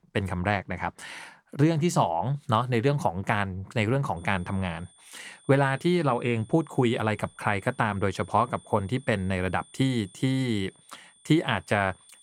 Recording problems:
high-pitched whine; faint; from 4 s on; 9 kHz, 25 dB below the speech

